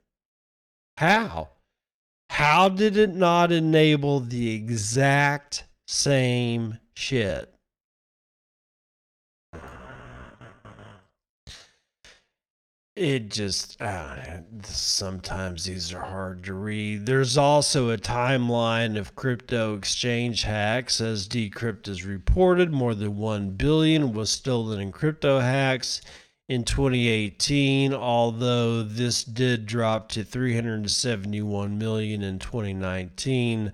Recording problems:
wrong speed, natural pitch; too slow; 0.6 times normal speed

